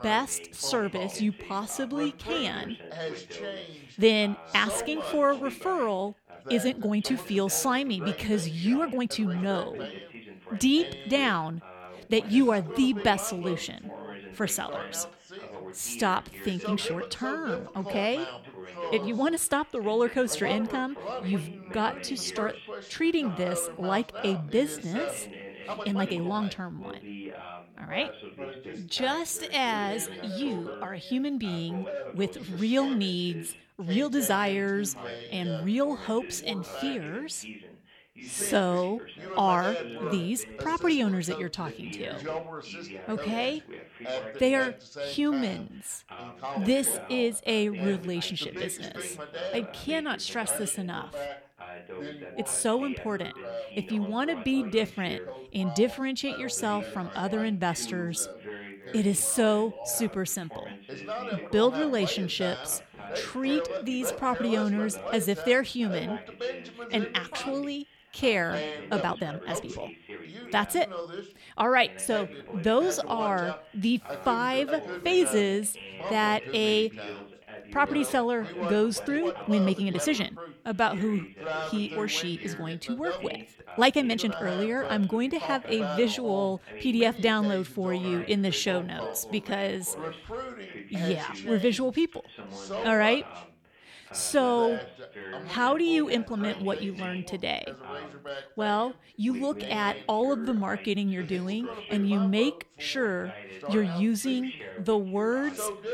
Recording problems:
background chatter; noticeable; throughout; 2 voices, 10 dB below the speech
uneven, jittery; strongly; from 6 s to 1:41

